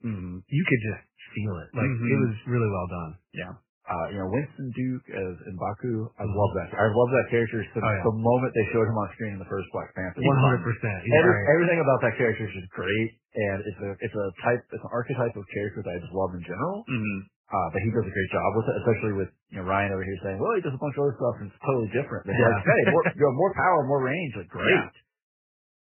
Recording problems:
garbled, watery; badly; nothing above 3 kHz

